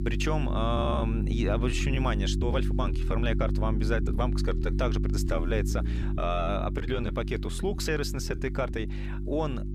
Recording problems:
electrical hum; loud; throughout; 50 Hz, 9 dB below the speech
uneven, jittery; strongly; from 1 to 9 s

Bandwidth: 15 kHz